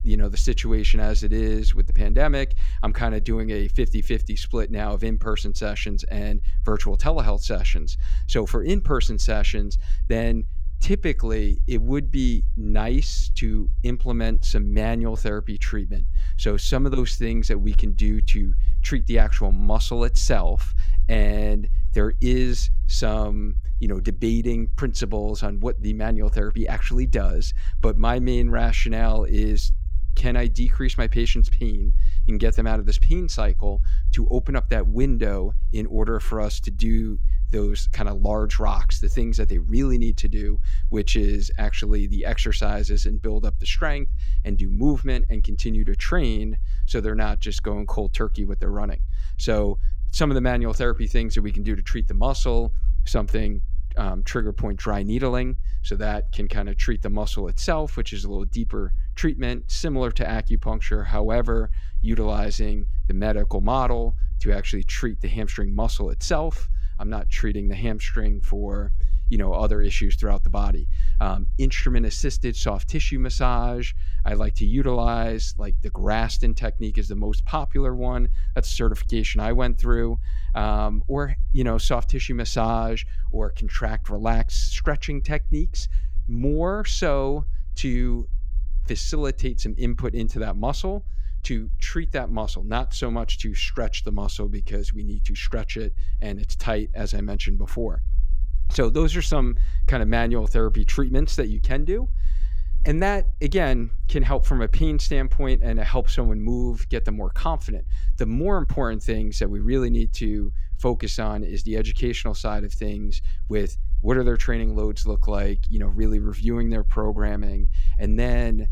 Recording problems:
low rumble; faint; throughout; 25 dB below the speech

